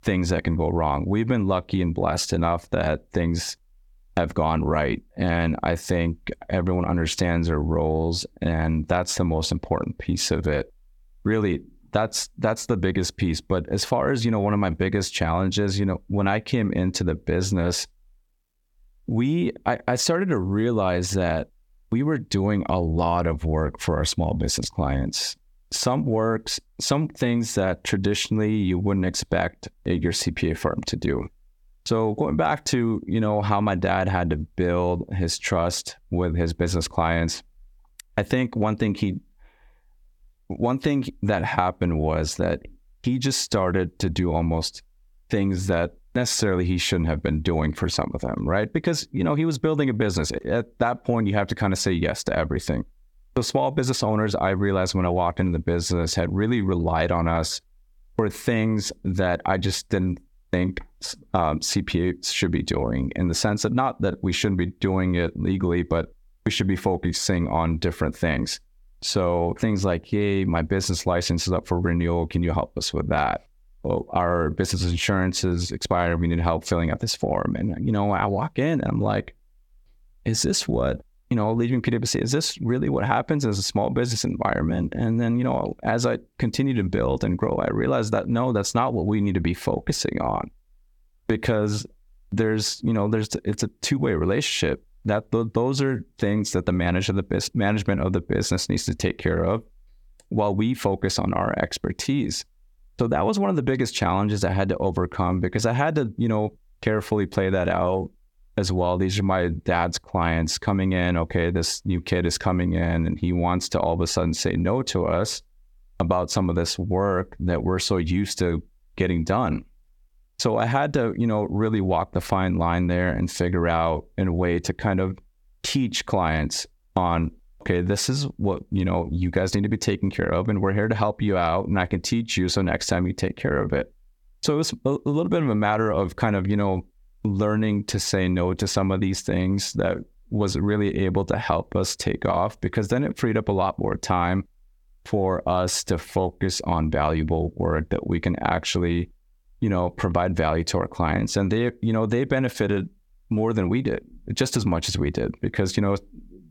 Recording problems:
squashed, flat; somewhat

